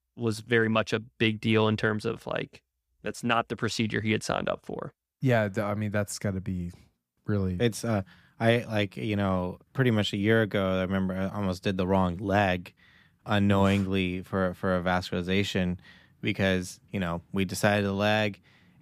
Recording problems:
none

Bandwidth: 15 kHz